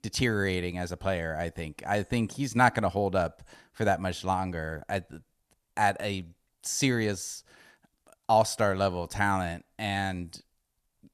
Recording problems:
none

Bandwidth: 14 kHz